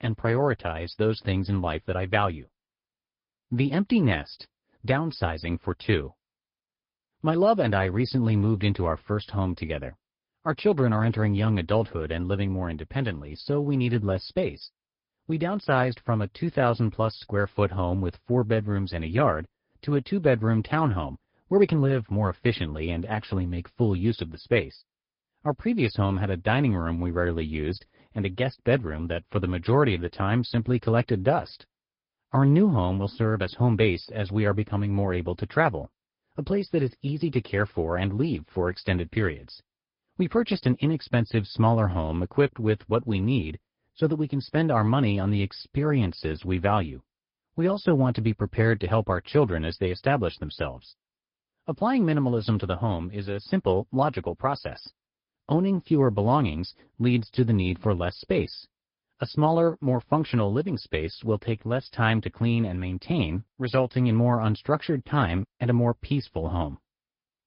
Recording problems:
high frequencies cut off; noticeable; nothing above 5 kHz
garbled, watery; slightly

